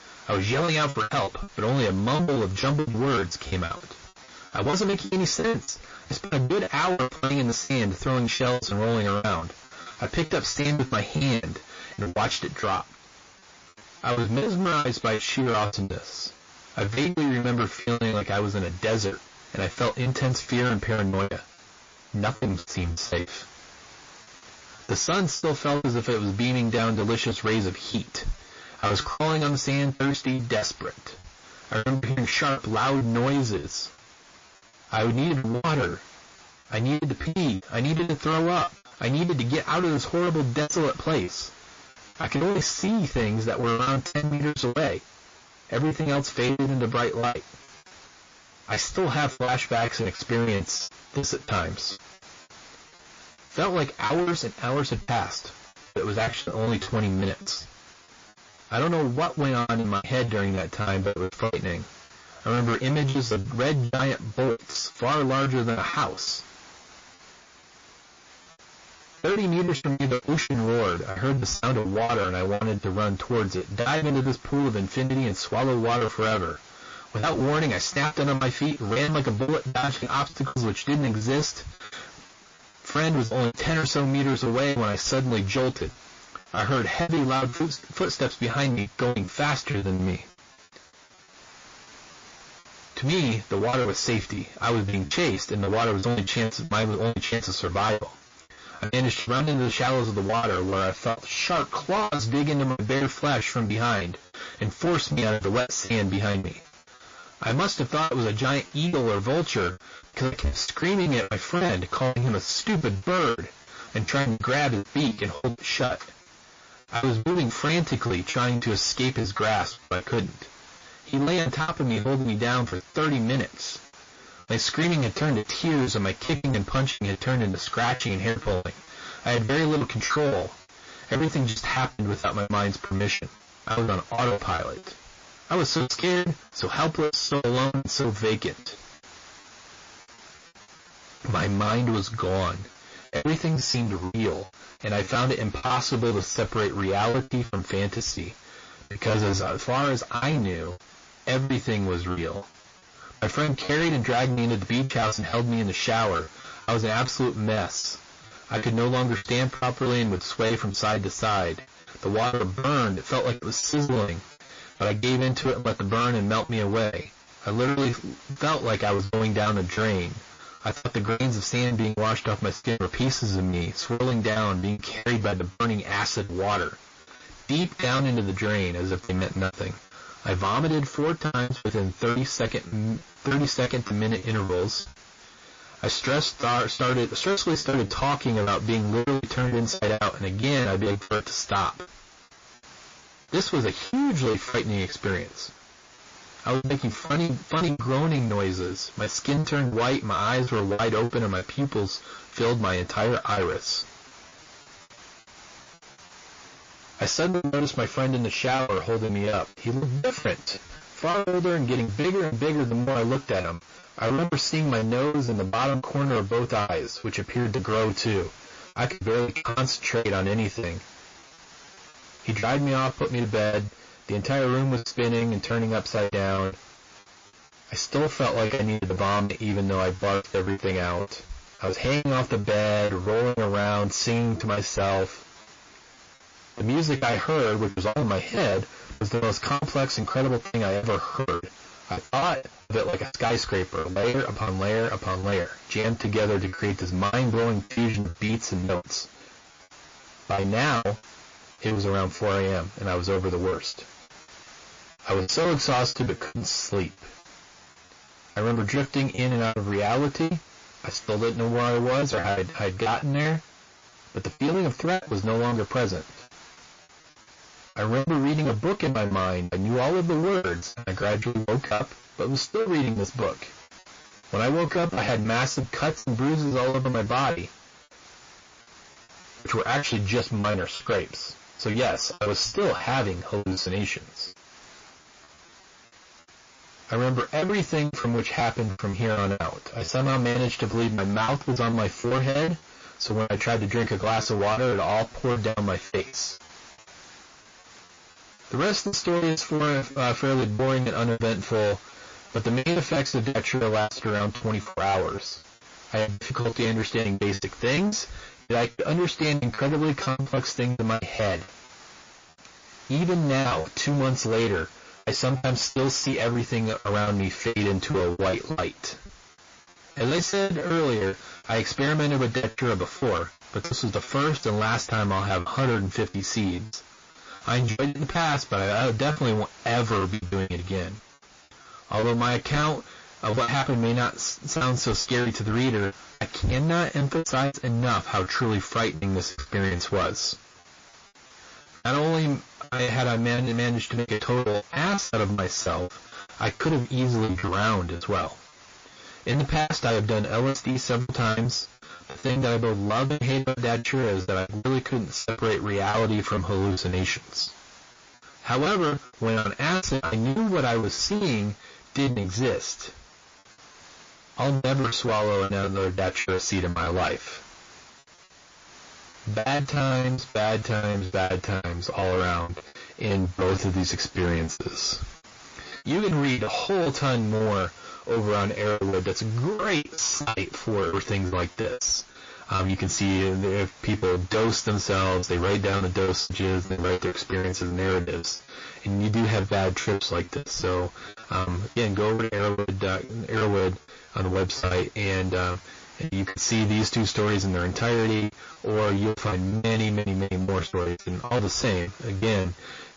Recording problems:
distortion; heavy; 8 dB below the speech
garbled, watery; slightly; nothing above 6 kHz
hiss; faint; throughout; 20 dB below the speech
choppy; very; 17% of the speech affected

